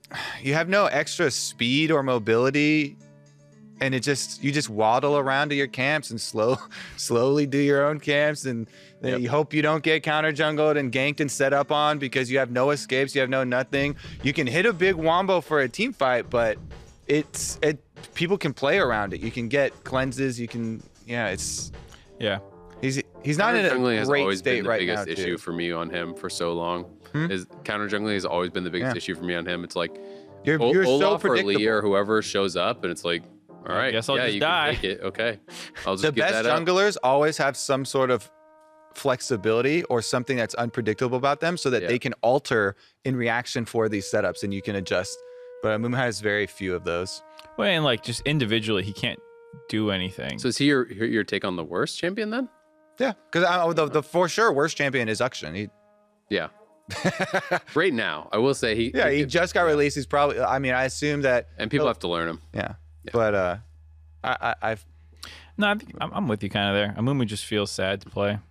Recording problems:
background music; faint; throughout; 25 dB below the speech

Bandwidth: 14.5 kHz